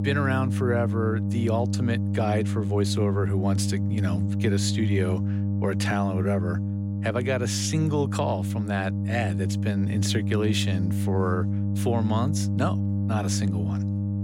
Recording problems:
electrical hum; loud; throughout; 50 Hz, 7 dB below the speech

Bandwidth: 16 kHz